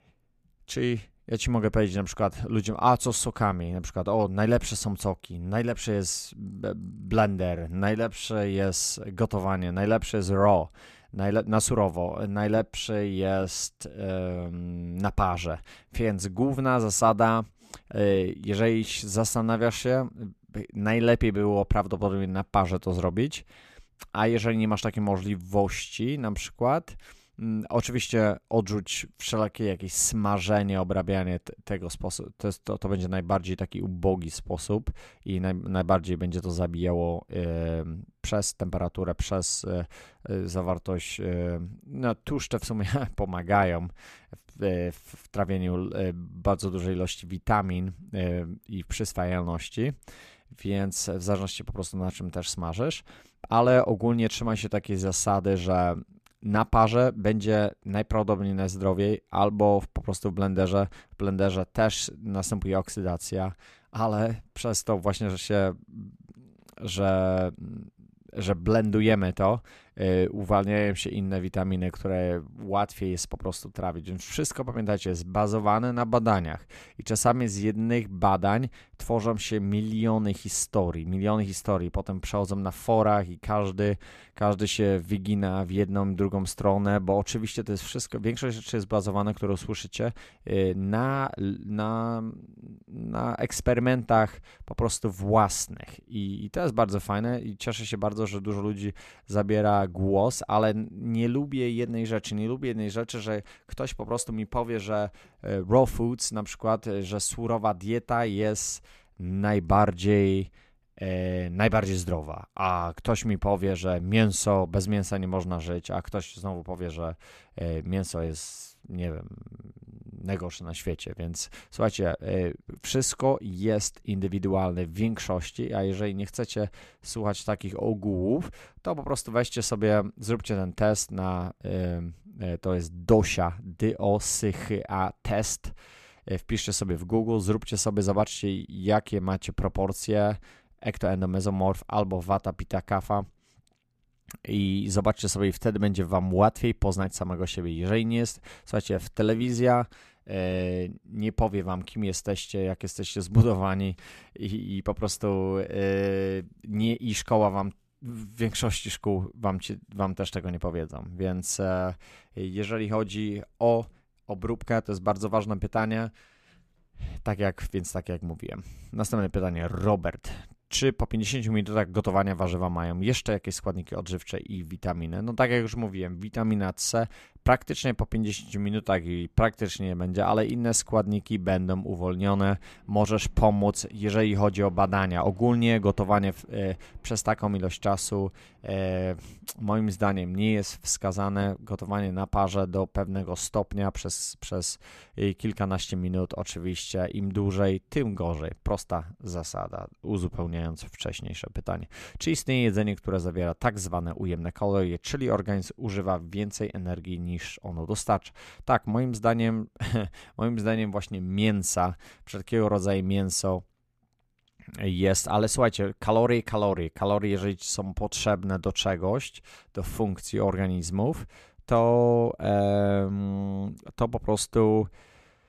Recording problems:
none

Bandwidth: 14.5 kHz